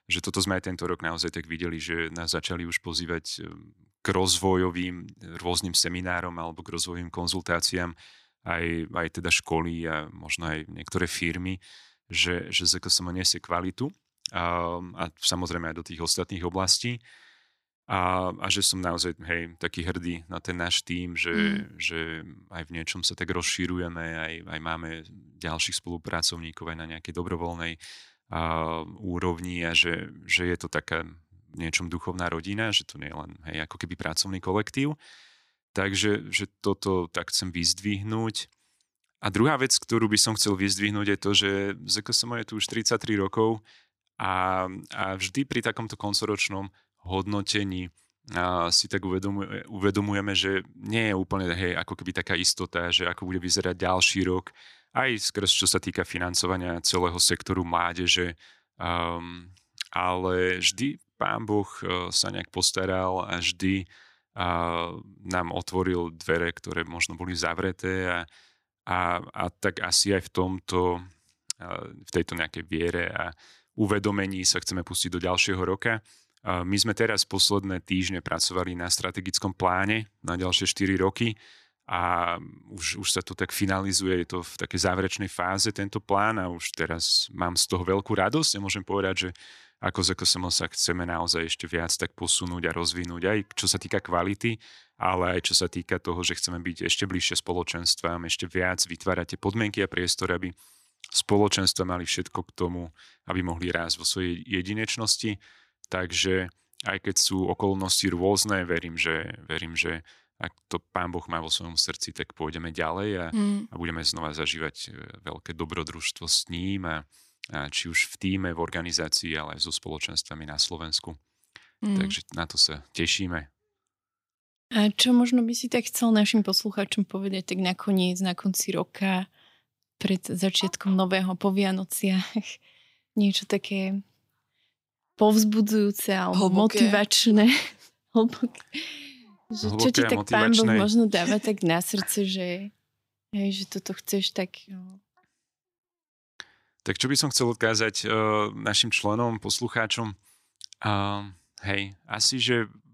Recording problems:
none

